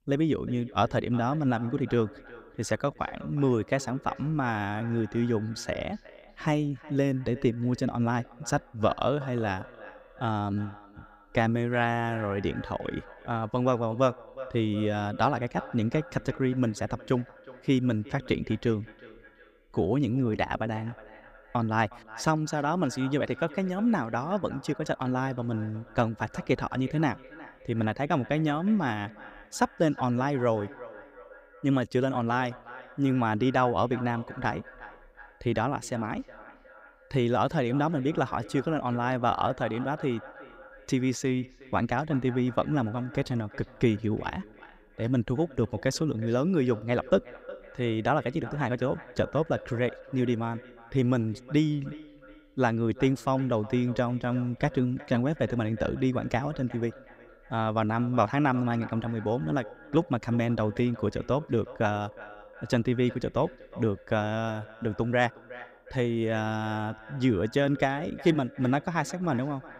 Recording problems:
echo of what is said; faint; throughout; 360 ms later, 20 dB below the speech

